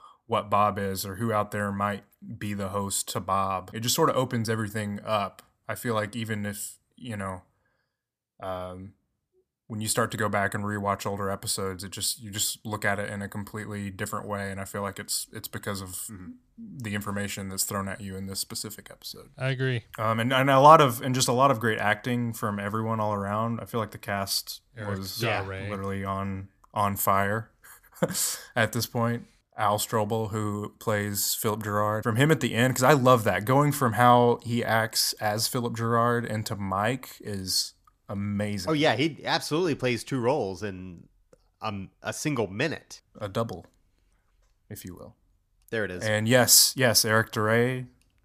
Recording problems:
none

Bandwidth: 14.5 kHz